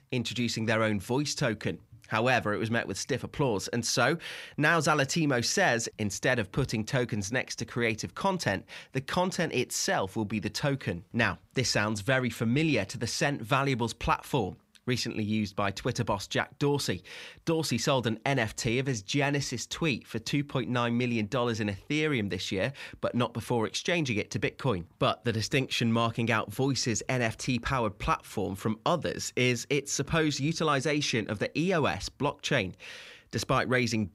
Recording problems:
none

